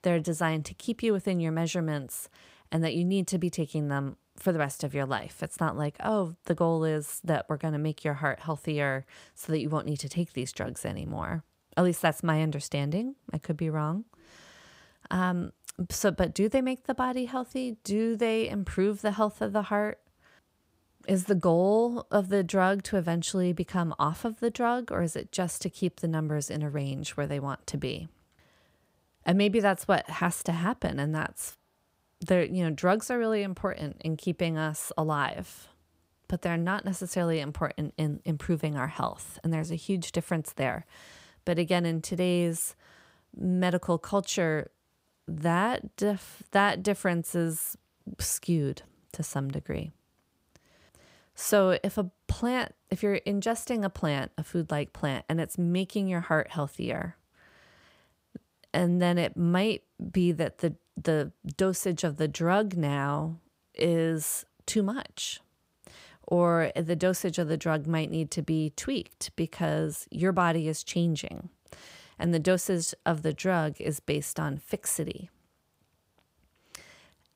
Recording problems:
none

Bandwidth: 15.5 kHz